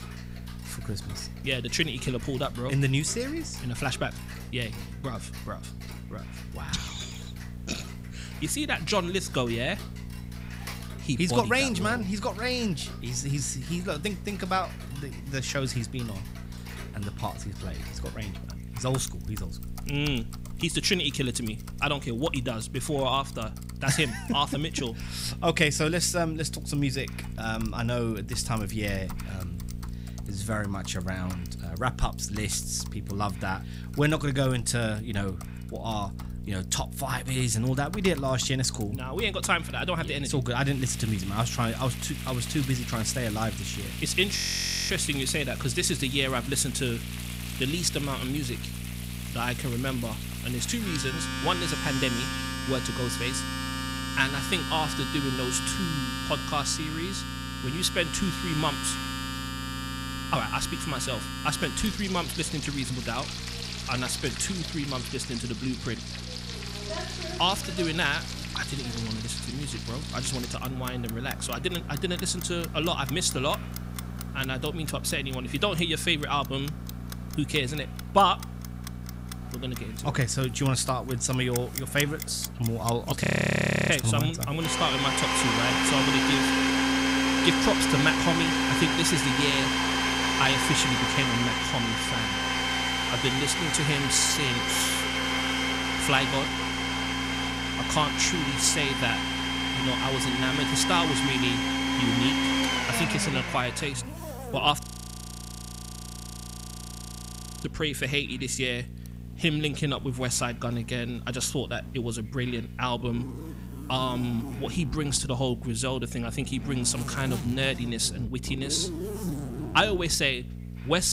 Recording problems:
household noises; loud; throughout; 2 dB below the speech
electrical hum; faint; throughout; 60 Hz, 20 dB below the speech
hiss; faint; throughout; 30 dB below the speech
audio freezing; at 44 s for 0.5 s, at 1:23 for 0.5 s and at 1:45 for 3 s
abrupt cut into speech; at the end

